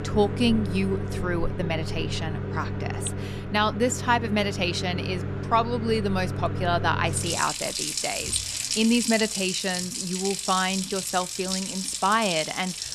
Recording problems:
household noises; loud; throughout; 3 dB below the speech

